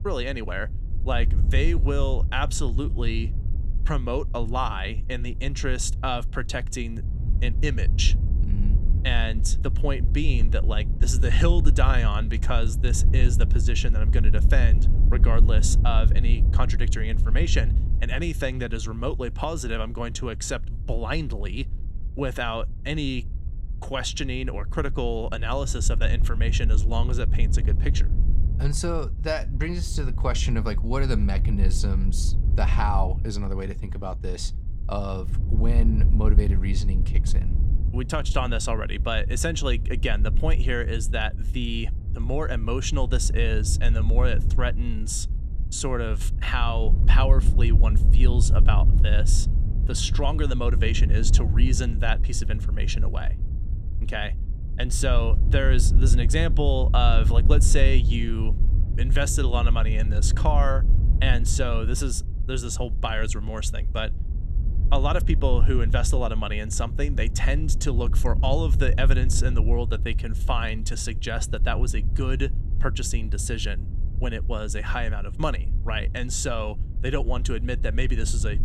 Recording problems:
wind noise on the microphone; occasional gusts; 15 dB below the speech

